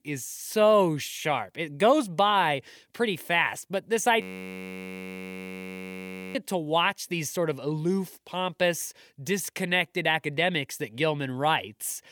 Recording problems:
audio freezing; at 4 s for 2 s

